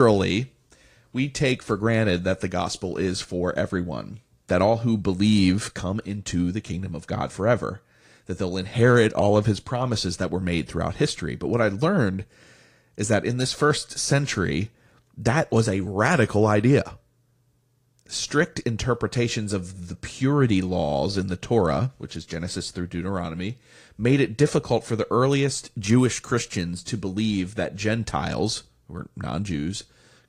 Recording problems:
garbled, watery; slightly; nothing above 15.5 kHz
abrupt cut into speech; at the start

